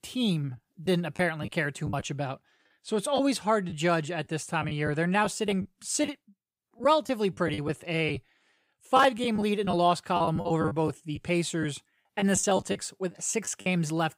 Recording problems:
choppy; very; 9% of the speech affected

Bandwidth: 15.5 kHz